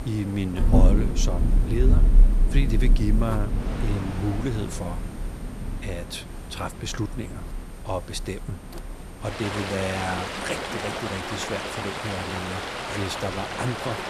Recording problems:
rain or running water; very loud; throughout; 4 dB above the speech
electrical hum; noticeable; throughout; 60 Hz, 15 dB below the speech
wind noise on the microphone; occasional gusts; 10 dB below the speech

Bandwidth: 13.5 kHz